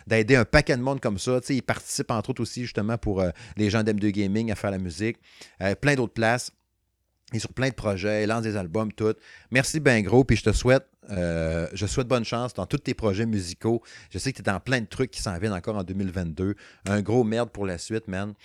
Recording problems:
choppy; very; from 9.5 to 11 s; 6% of the speech affected

